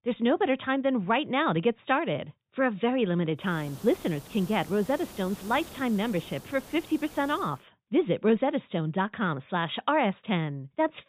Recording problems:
high frequencies cut off; severe; nothing above 4 kHz
hiss; noticeable; from 3.5 to 7.5 s; 20 dB below the speech

